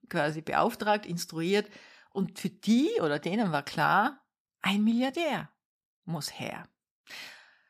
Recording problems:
none

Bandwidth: 14.5 kHz